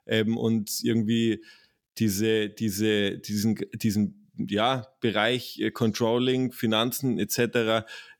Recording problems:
none

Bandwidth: 18.5 kHz